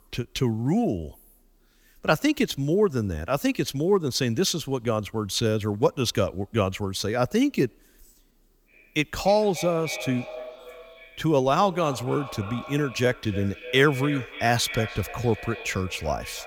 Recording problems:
echo of what is said; noticeable; from 8.5 s on; 290 ms later, 15 dB below the speech

